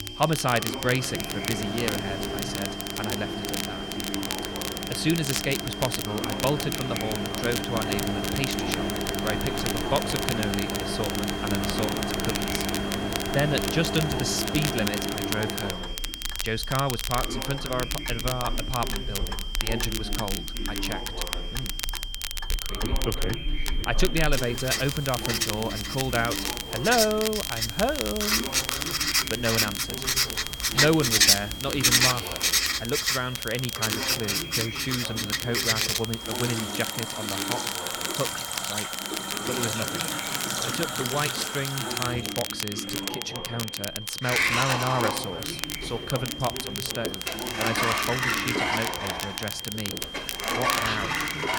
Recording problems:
household noises; very loud; throughout; 2 dB above the speech
high-pitched whine; loud; throughout; 3 kHz, 7 dB below the speech
voice in the background; loud; throughout; 8 dB below the speech
crackle, like an old record; loud; 3 dB below the speech
animal sounds; faint; throughout; 25 dB below the speech

